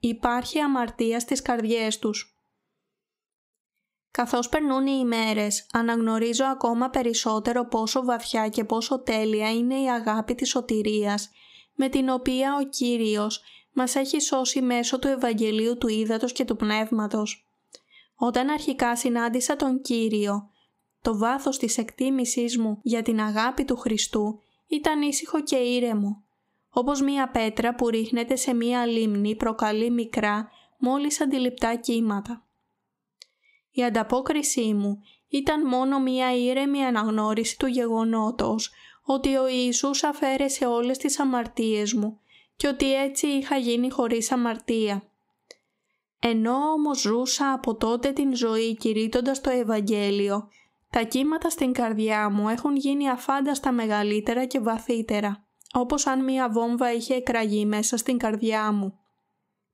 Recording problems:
squashed, flat; somewhat

